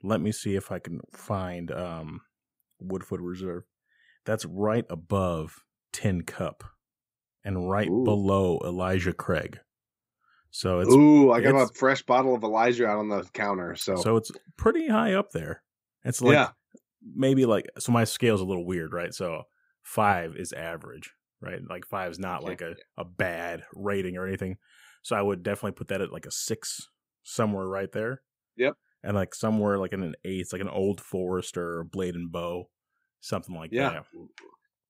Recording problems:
none

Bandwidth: 15.5 kHz